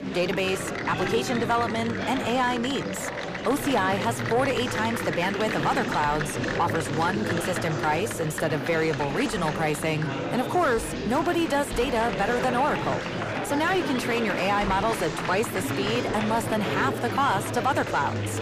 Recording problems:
distortion; slight; 10 dB below the speech
murmuring crowd; loud; throughout; 3 dB below the speech

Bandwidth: 15 kHz